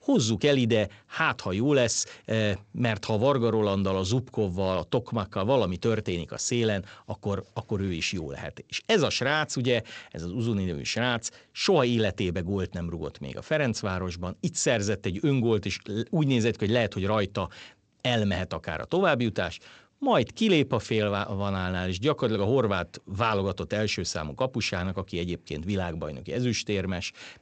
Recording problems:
garbled, watery; slightly; nothing above 7.5 kHz

